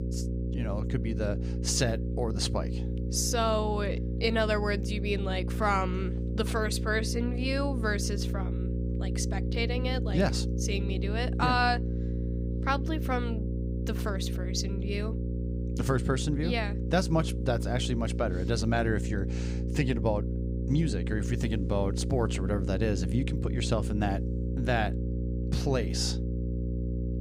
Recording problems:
electrical hum; loud; throughout; 60 Hz, 10 dB below the speech

